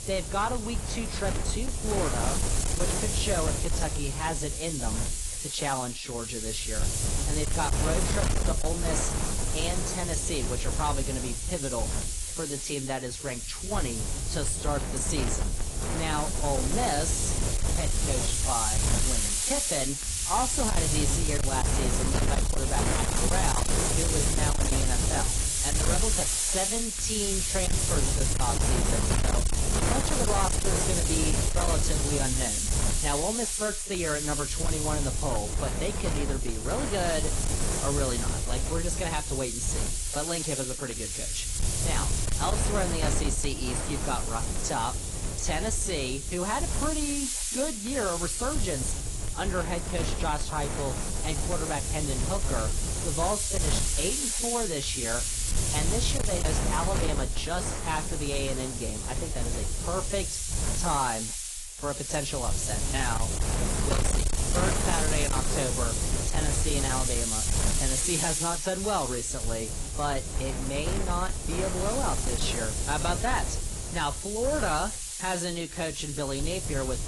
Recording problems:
distortion; slight; 9% of the sound clipped
garbled, watery; slightly; nothing above 10.5 kHz
wind noise on the microphone; heavy; as loud as the speech
high-pitched whine; faint; throughout; 7 kHz, 20 dB below the speech

